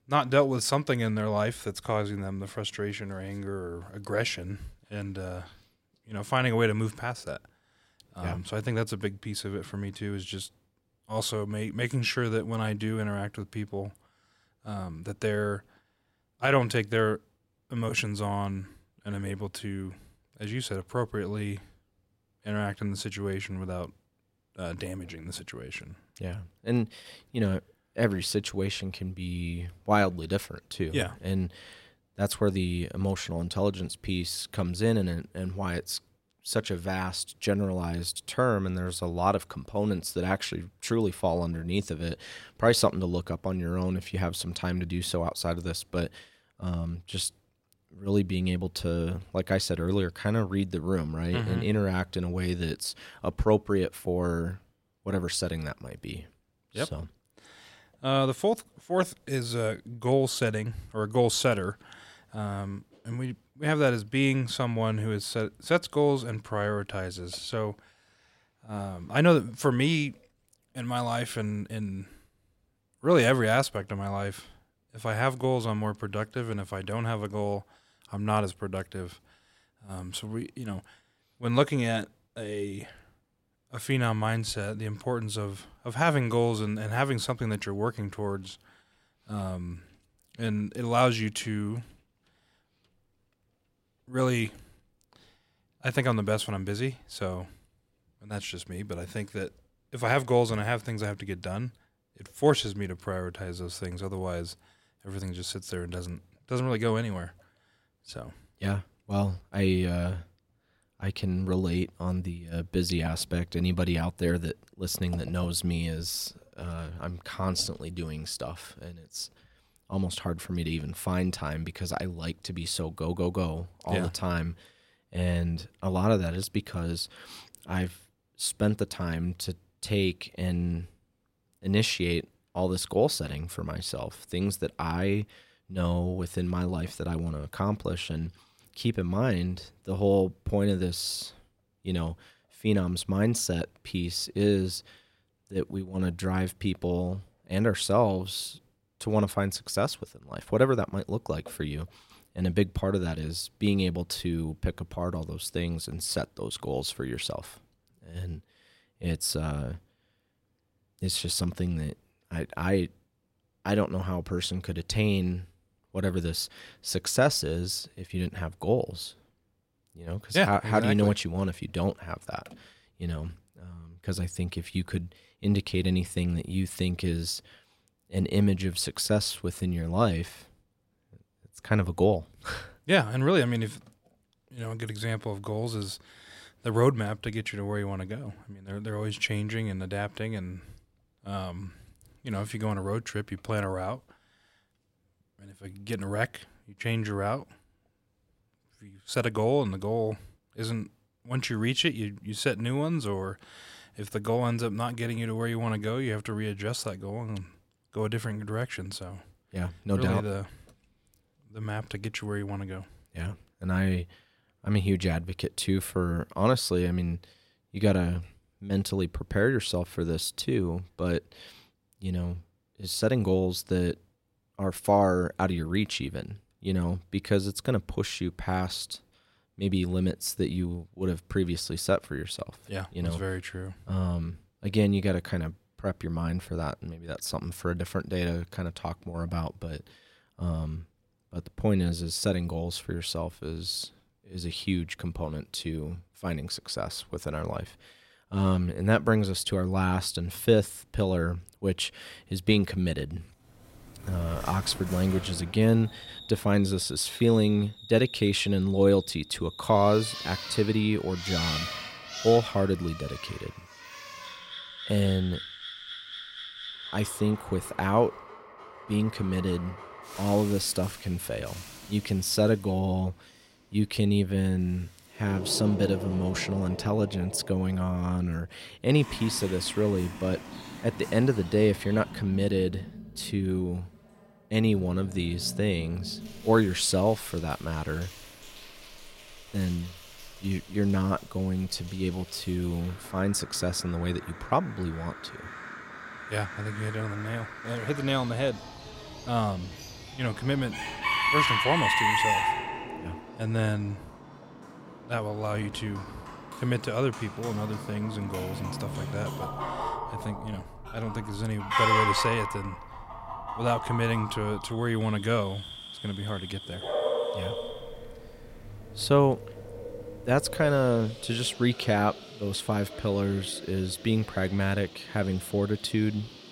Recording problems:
animal sounds; loud; from 4:14 on; 6 dB below the speech

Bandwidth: 16 kHz